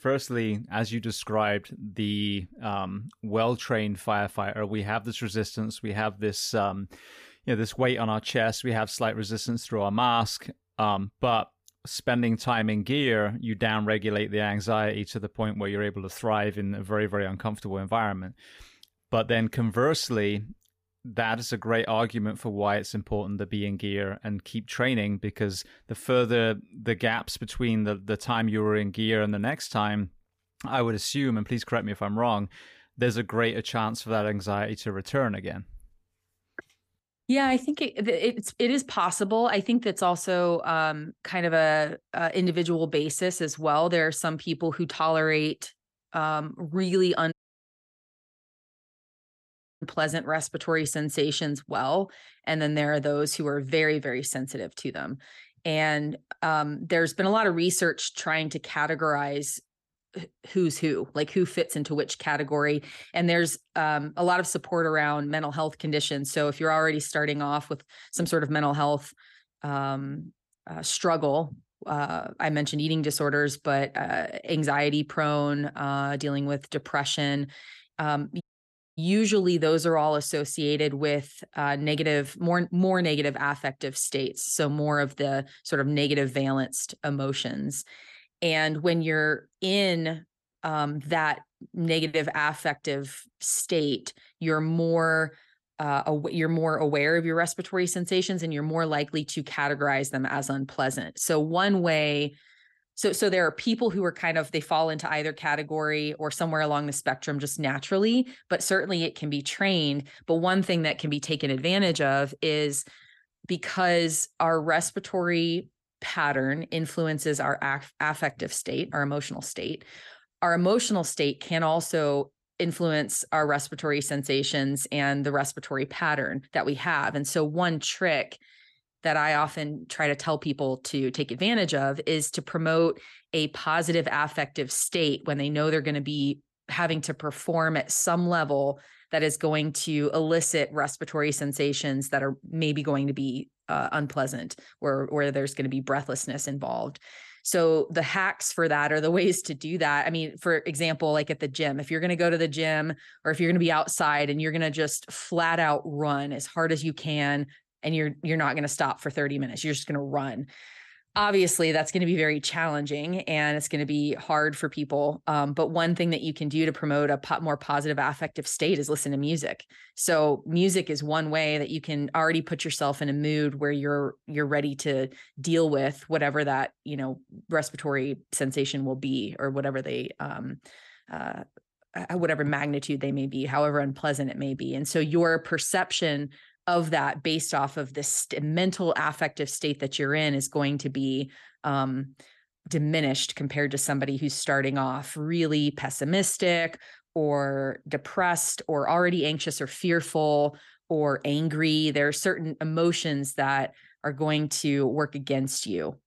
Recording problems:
audio cutting out; at 47 s for 2.5 s and at 1:18 for 0.5 s

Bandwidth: 15 kHz